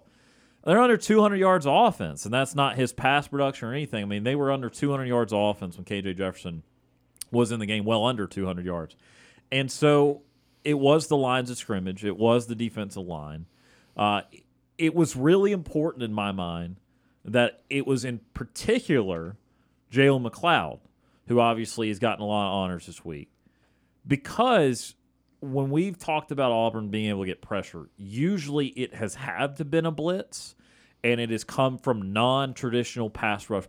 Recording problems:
none

